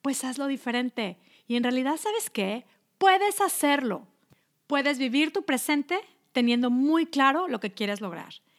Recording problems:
none

